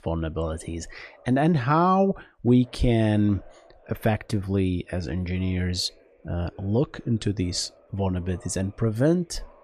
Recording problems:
voice in the background; faint; throughout; 30 dB below the speech

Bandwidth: 14 kHz